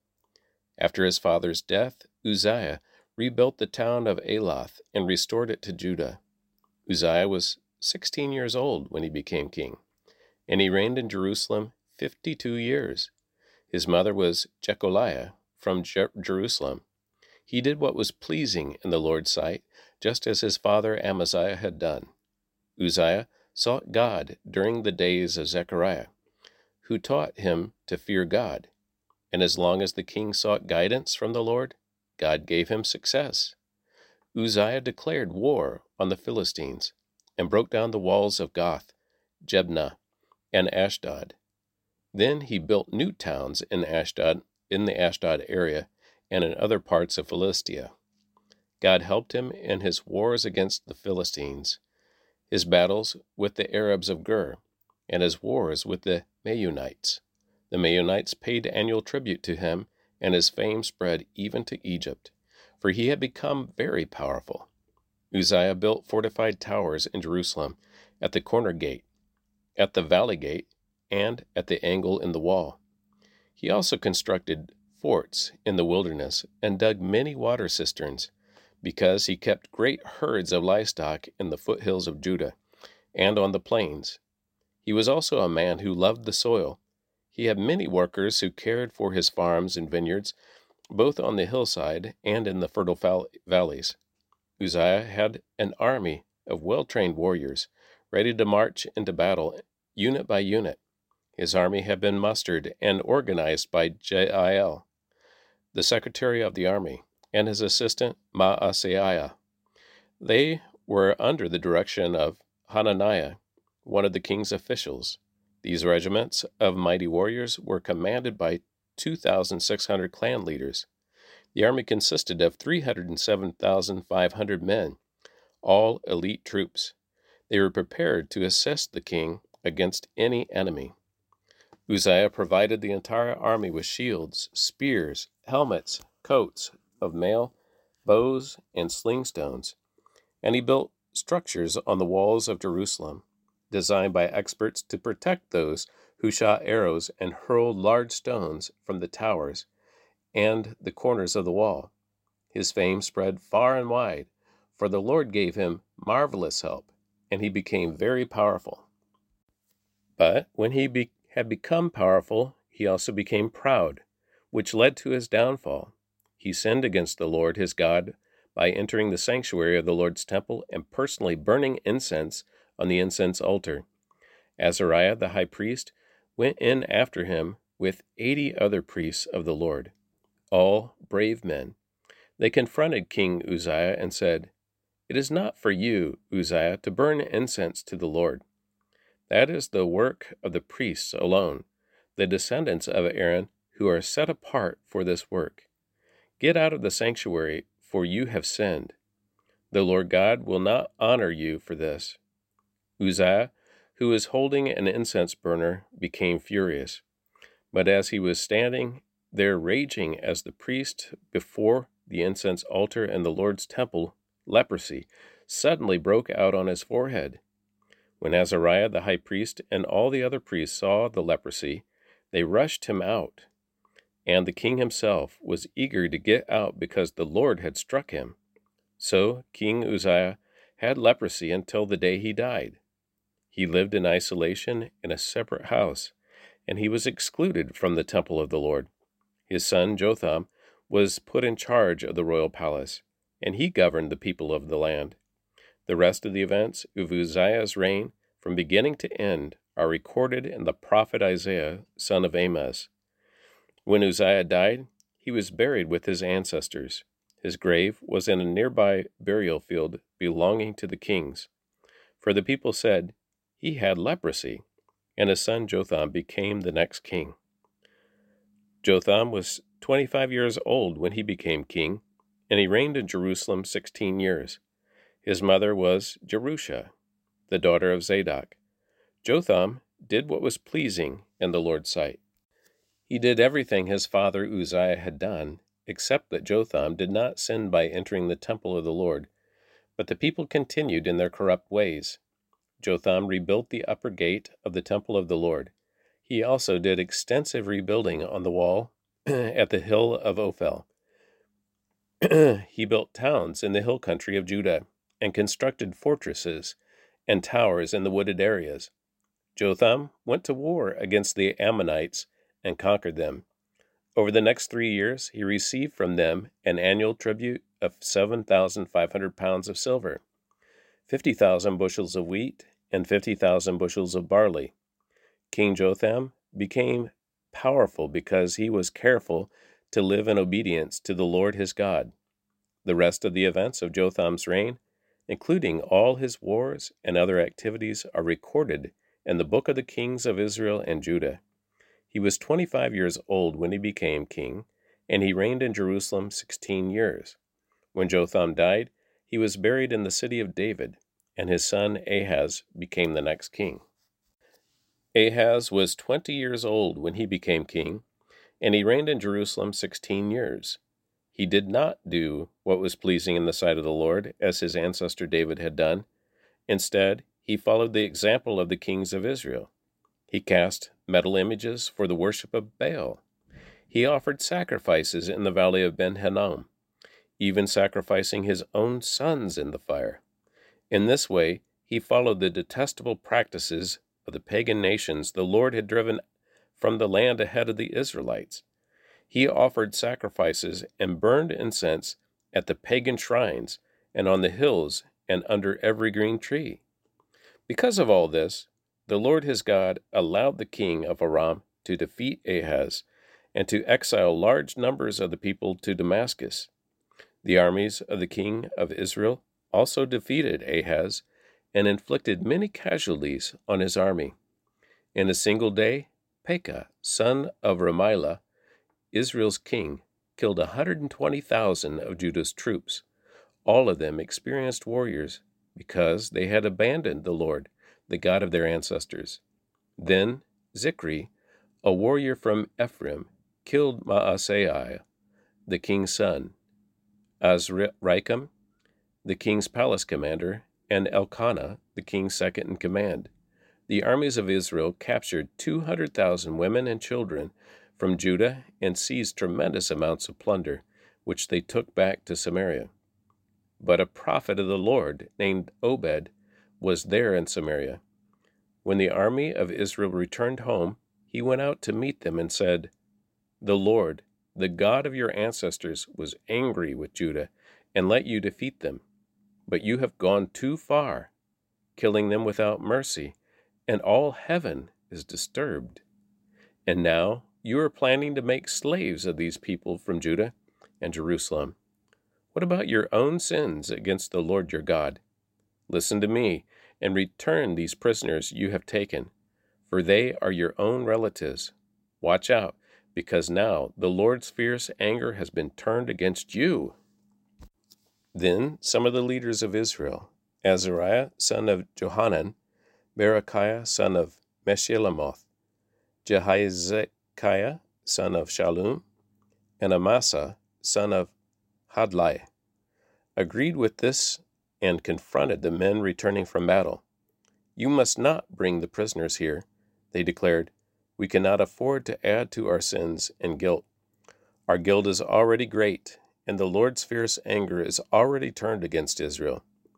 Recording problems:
none

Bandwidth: 16 kHz